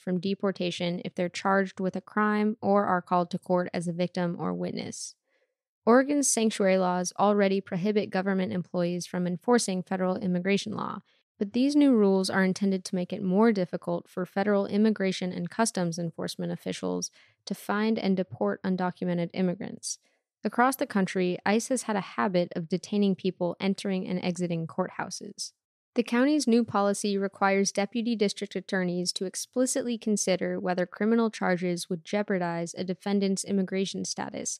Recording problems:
none

